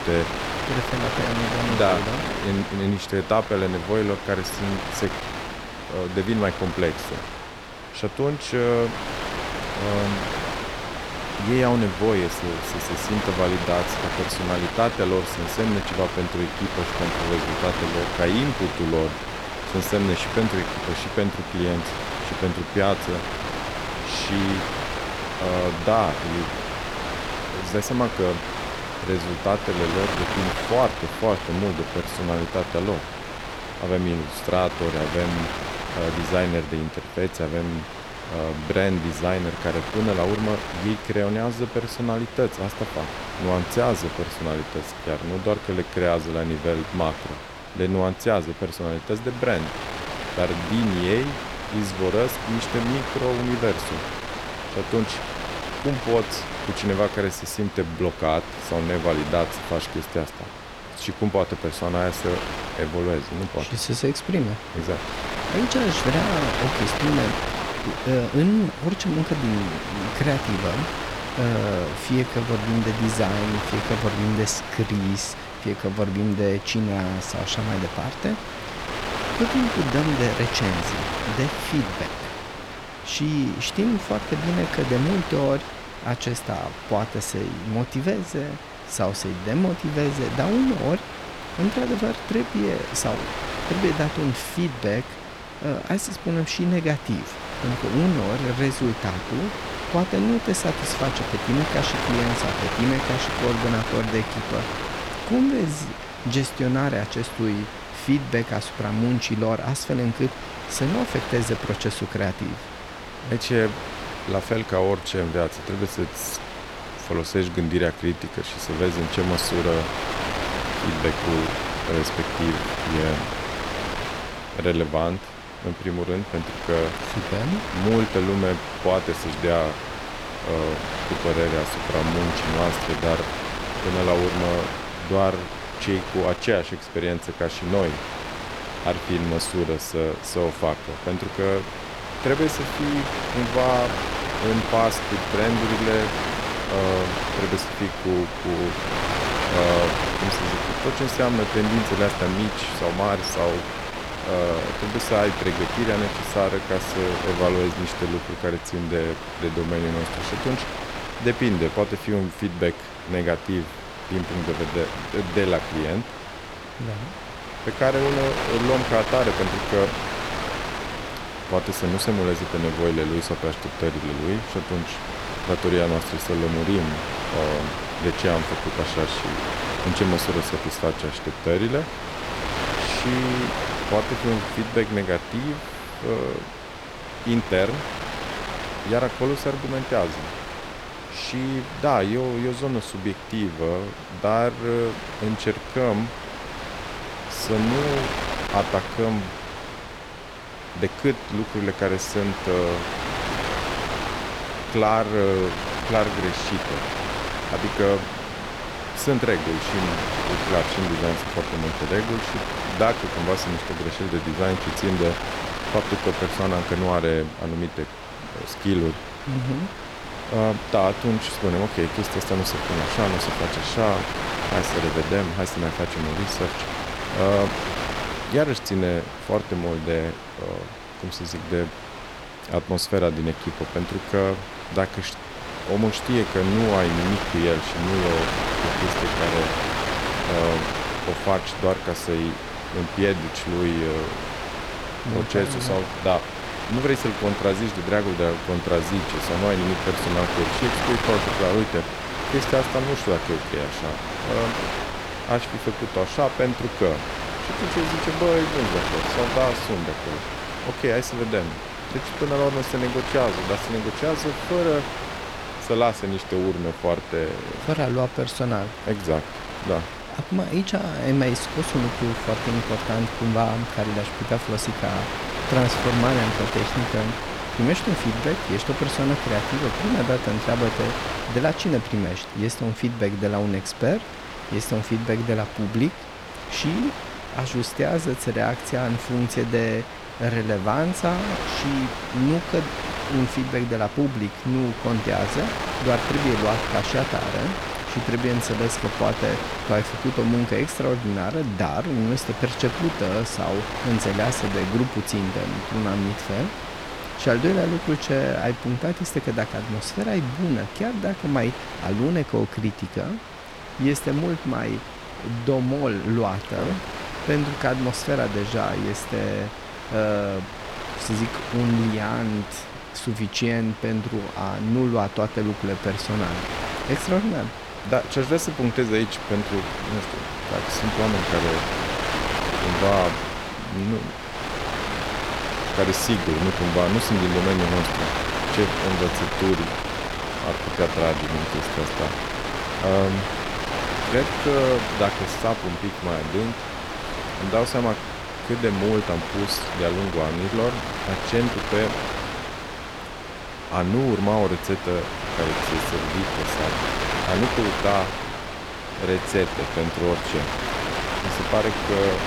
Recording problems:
wind noise on the microphone; heavy; 2 dB below the speech

